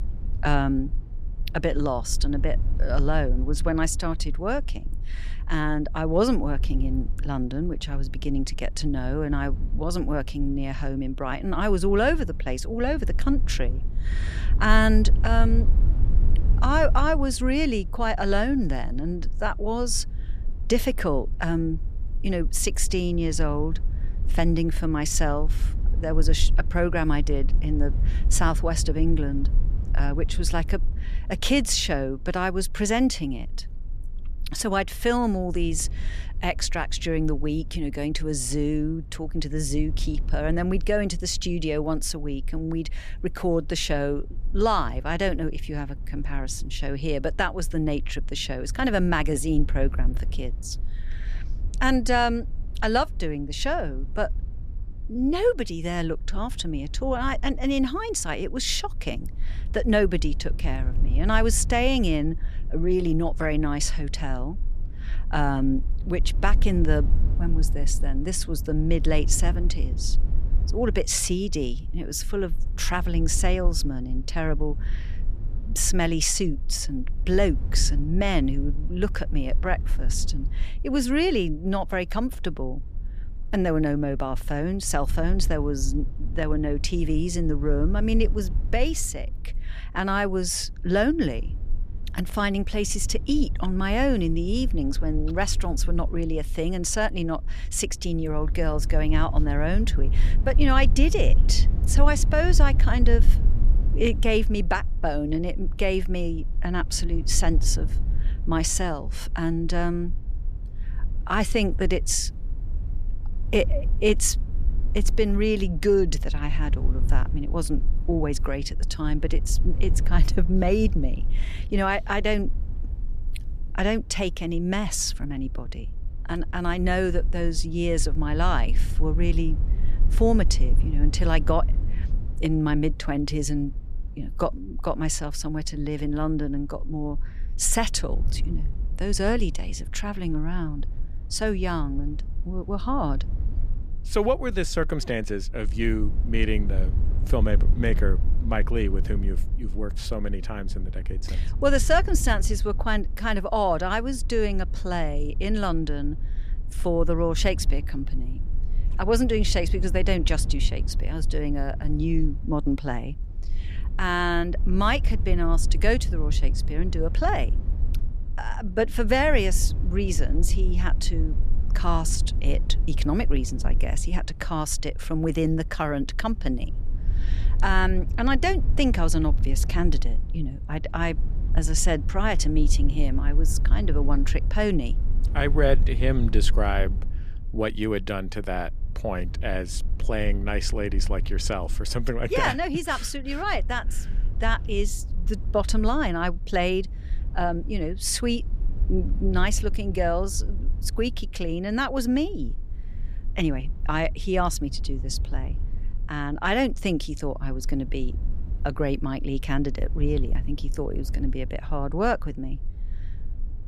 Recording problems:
low rumble; faint; throughout; 20 dB below the speech

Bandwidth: 14.5 kHz